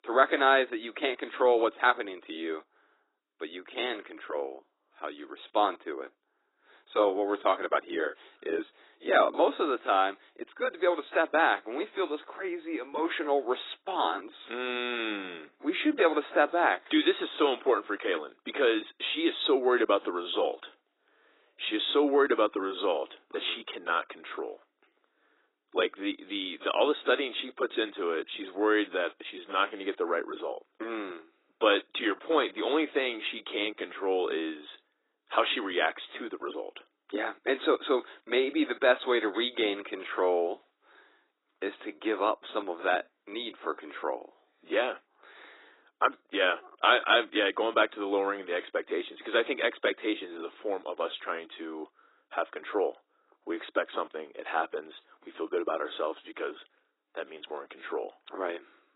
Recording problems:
garbled, watery; badly; nothing above 4 kHz
thin; very; fading below 300 Hz

